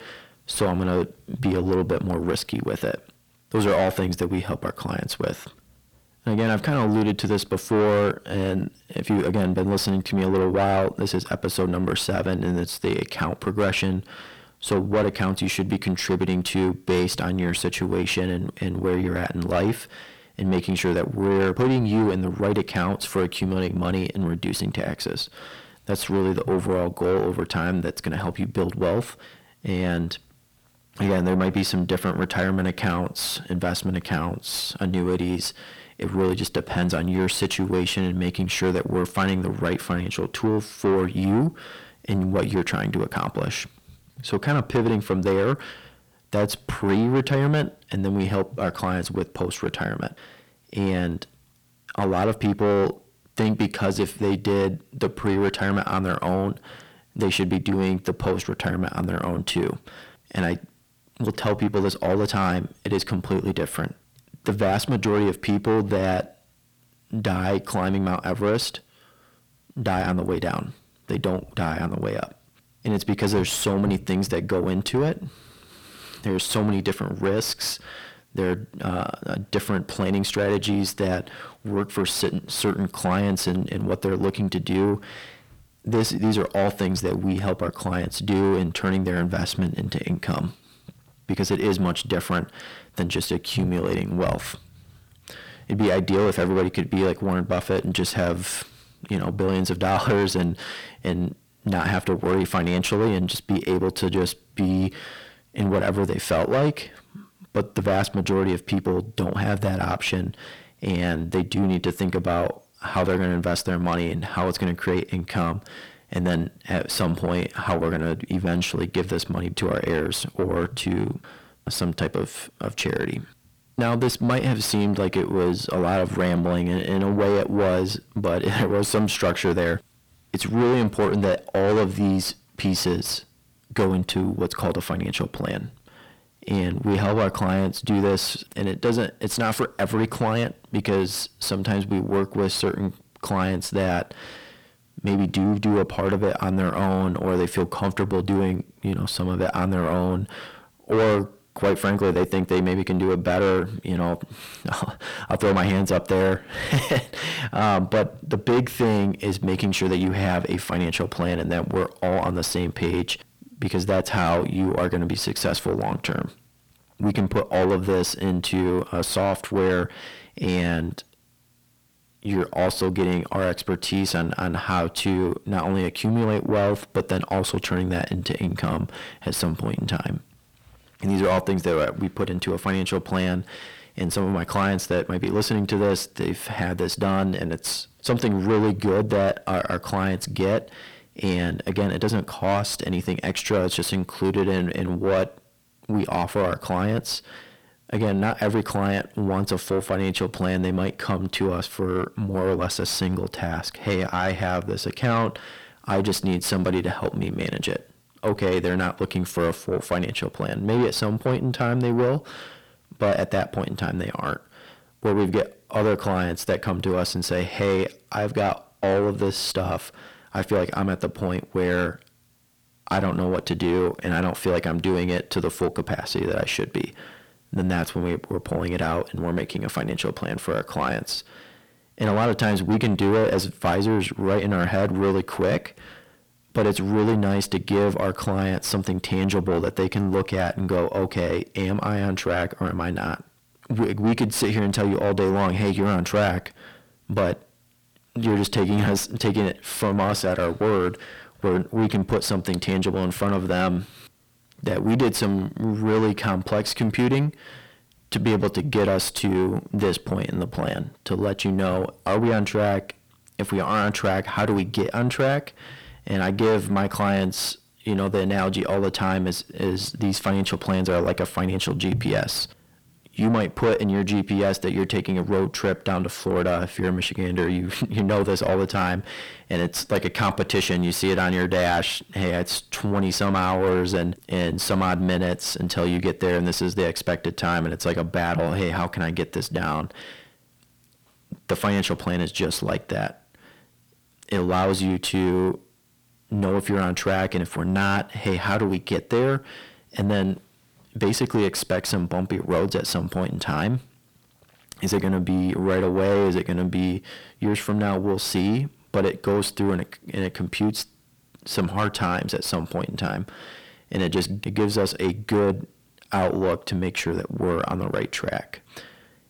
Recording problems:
distortion; heavy; 7 dB below the speech

